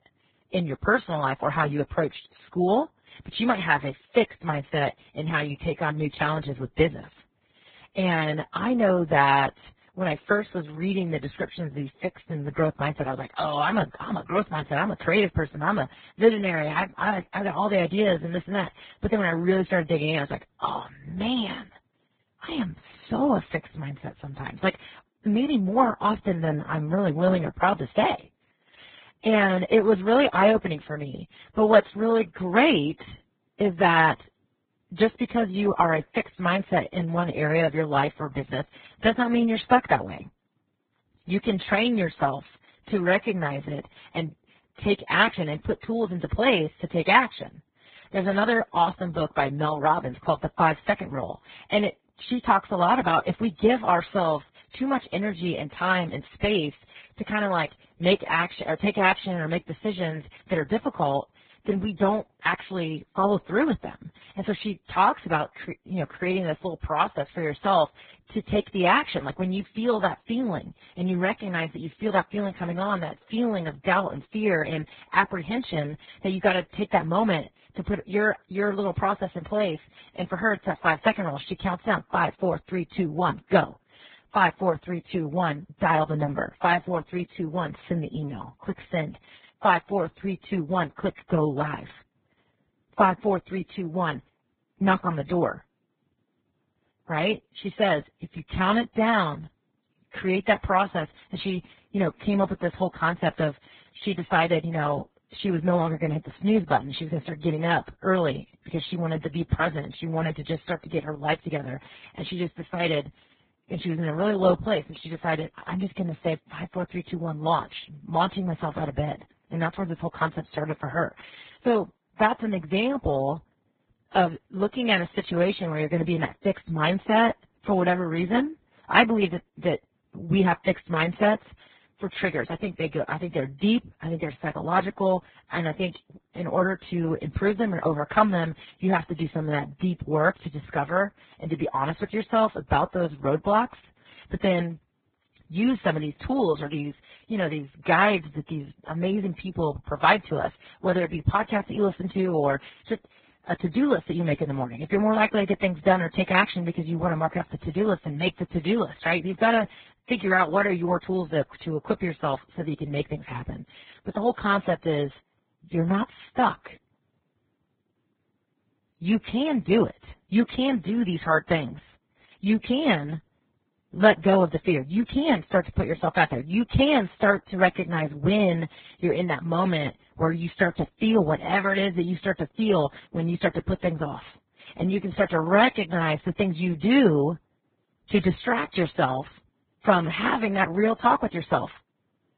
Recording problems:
garbled, watery; badly; nothing above 4 kHz

